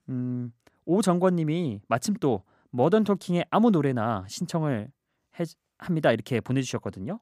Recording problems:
none

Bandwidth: 15 kHz